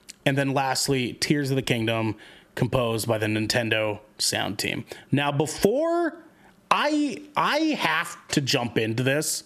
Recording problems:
squashed, flat; somewhat

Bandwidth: 14 kHz